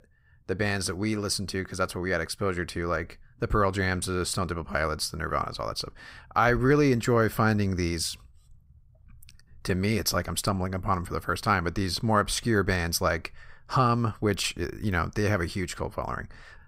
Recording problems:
none

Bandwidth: 15.5 kHz